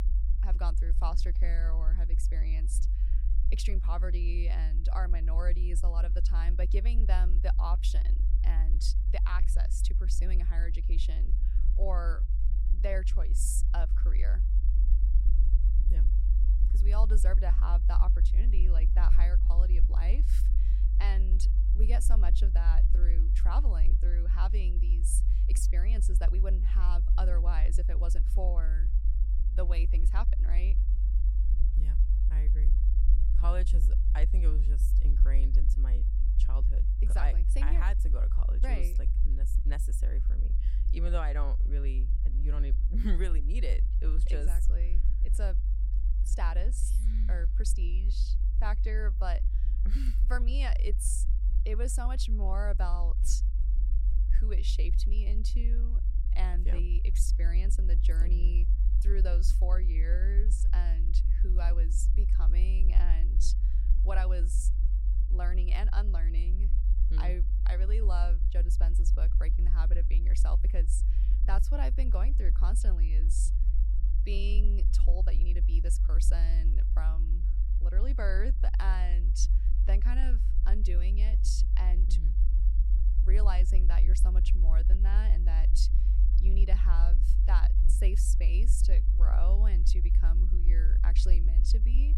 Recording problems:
low rumble; loud; throughout; 8 dB below the speech

